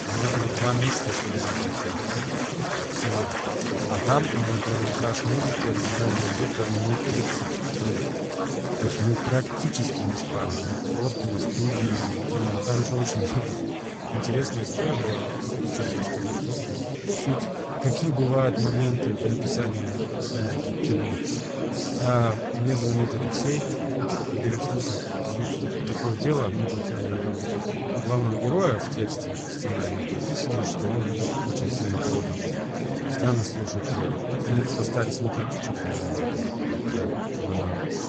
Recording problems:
garbled, watery; badly; nothing above 7.5 kHz
chatter from many people; very loud; throughout; as loud as the speech

